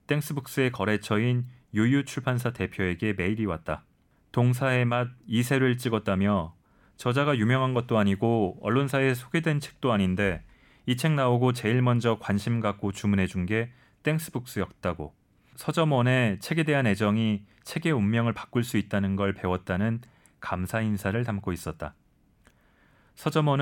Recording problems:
abrupt cut into speech; at the end

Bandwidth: 18 kHz